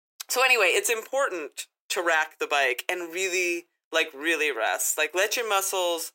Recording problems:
thin; very; fading below 350 Hz

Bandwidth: 16 kHz